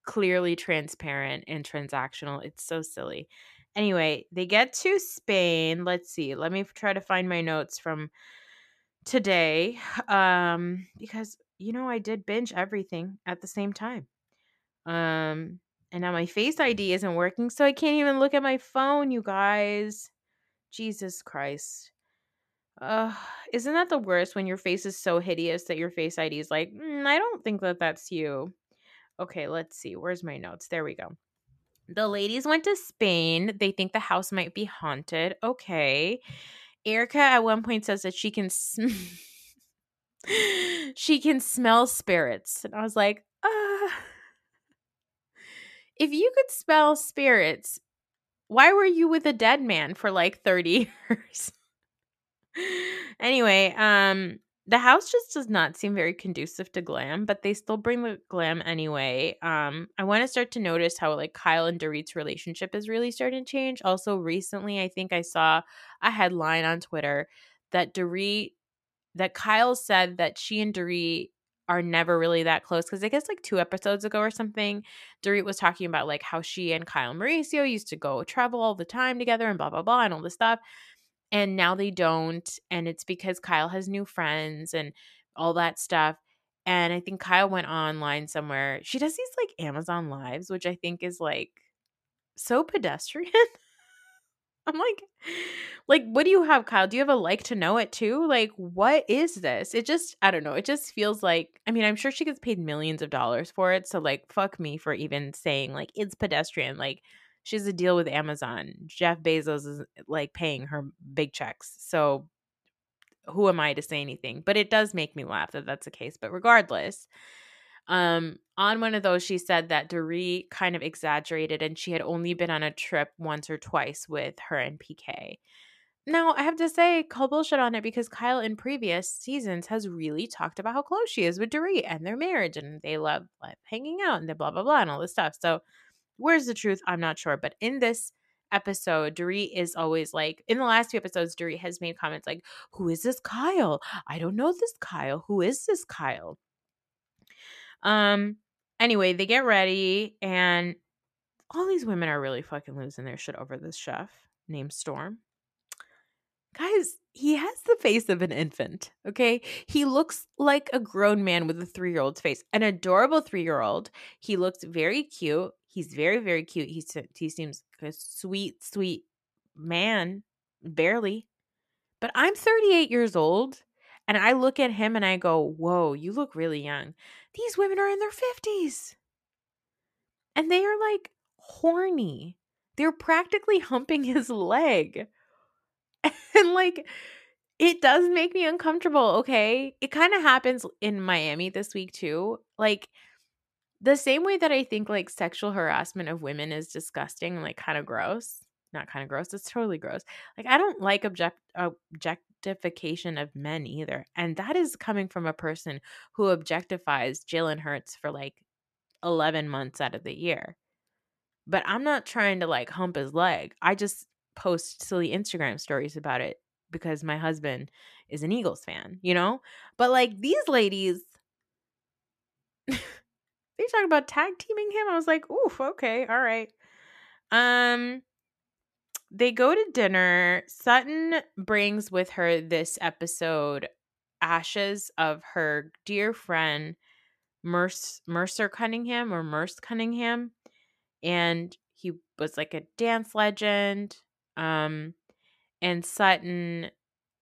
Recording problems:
none

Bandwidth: 14 kHz